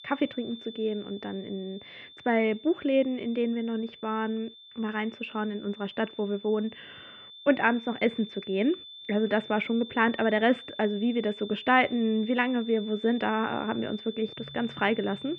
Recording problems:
muffled; very; fading above 2.5 kHz
high-pitched whine; noticeable; throughout; 3.5 kHz, 15 dB below the speech

